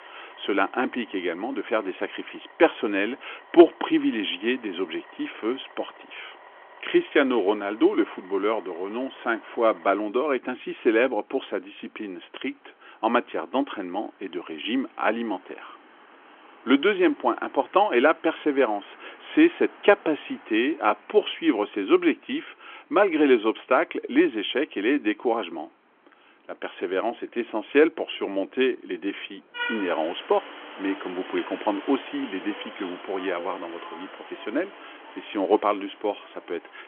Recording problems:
phone-call audio; nothing above 3.5 kHz
traffic noise; noticeable; throughout; 20 dB below the speech

